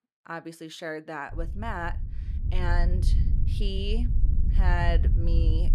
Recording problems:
wind noise on the microphone; occasional gusts; from 1.5 s on; 10 dB below the speech

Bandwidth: 14 kHz